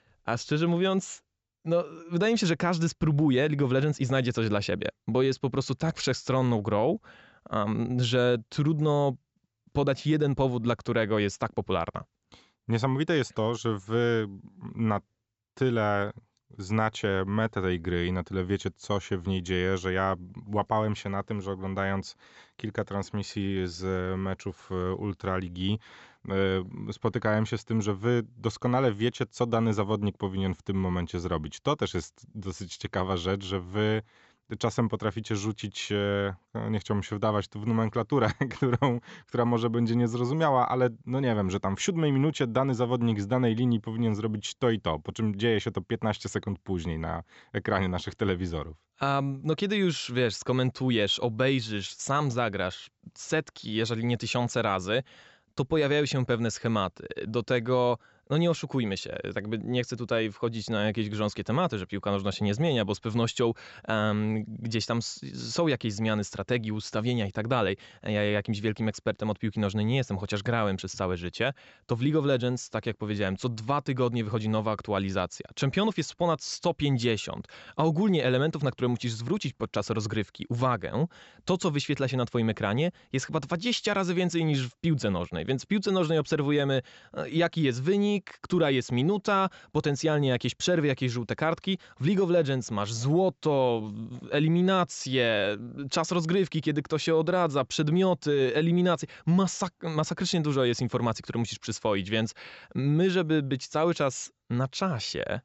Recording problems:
high frequencies cut off; noticeable; nothing above 7.5 kHz

